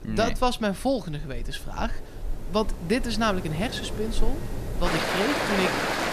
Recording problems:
rain or running water; loud; throughout; 3 dB below the speech

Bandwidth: 14.5 kHz